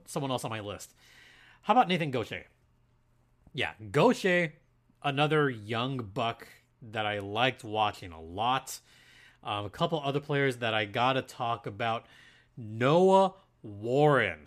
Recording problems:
none

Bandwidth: 14.5 kHz